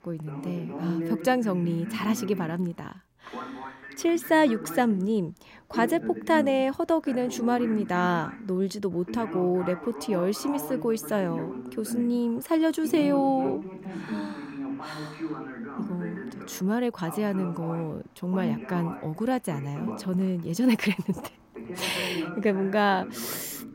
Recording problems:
voice in the background; loud; throughout; 10 dB below the speech

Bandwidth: 16 kHz